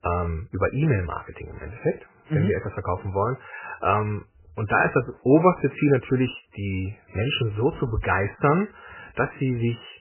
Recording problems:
garbled, watery; badly; nothing above 3 kHz

